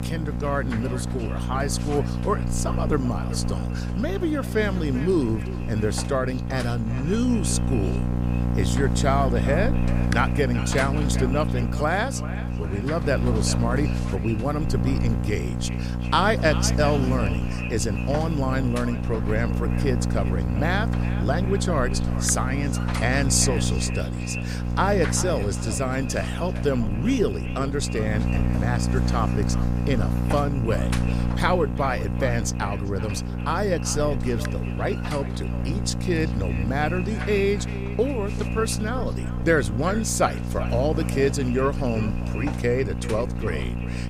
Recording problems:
echo of what is said; noticeable; throughout; 390 ms later, 15 dB below the speech
electrical hum; loud; throughout; 60 Hz, 8 dB below the speech

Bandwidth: 15.5 kHz